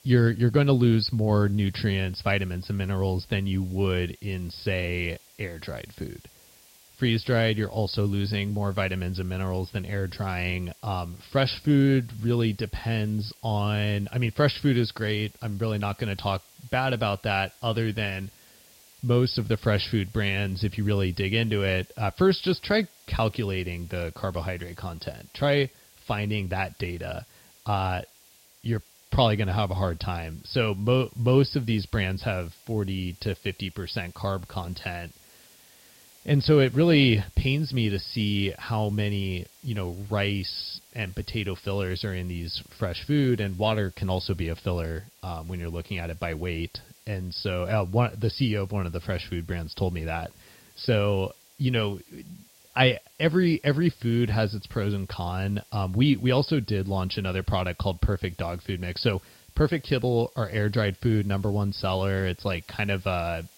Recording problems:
high frequencies cut off; noticeable; nothing above 5.5 kHz
hiss; faint; throughout; 25 dB below the speech

